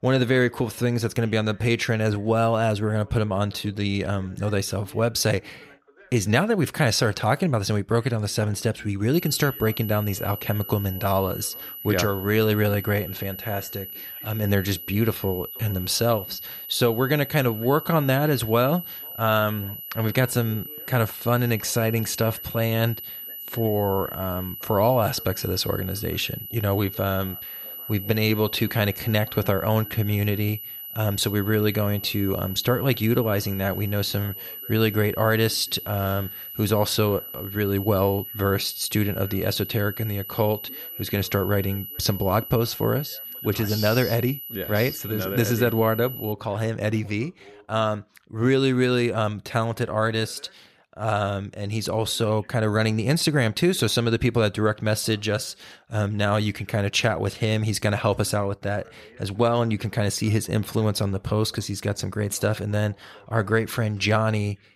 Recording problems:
high-pitched whine; loud; from 9 to 46 s; 12 kHz, 10 dB below the speech
voice in the background; faint; throughout; 30 dB below the speech

